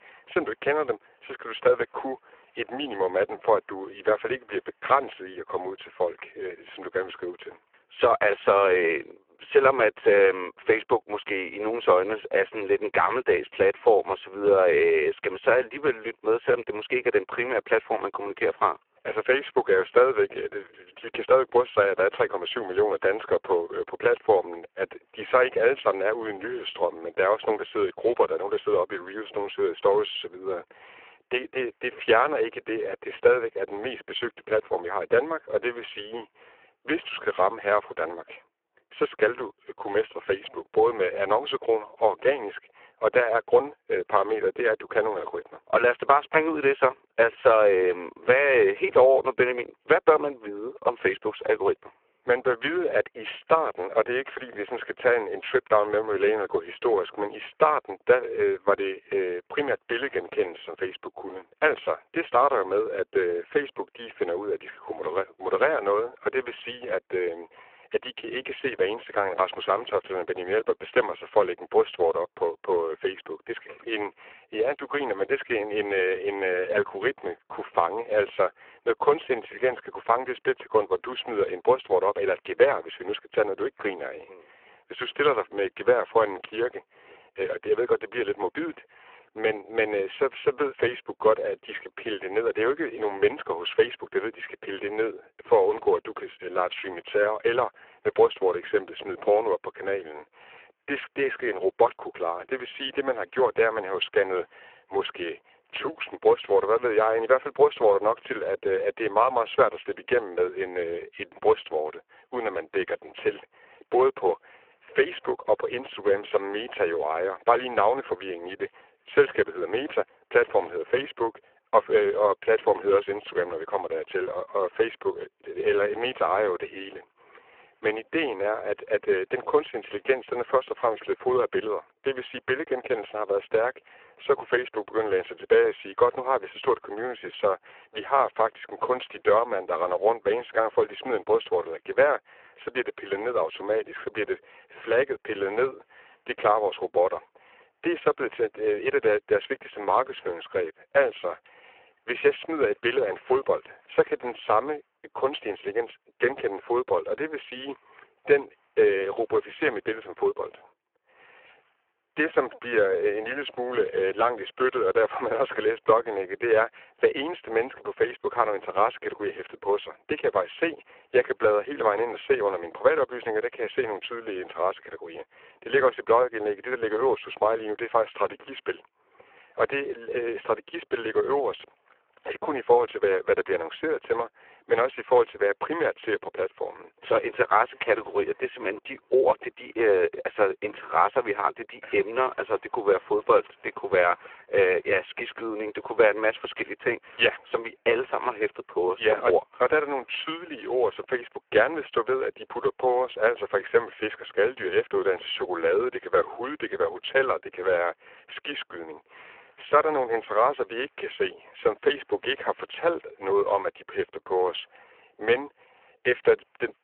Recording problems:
phone-call audio; poor line

